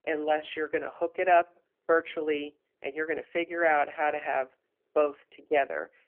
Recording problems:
phone-call audio; nothing above 3 kHz

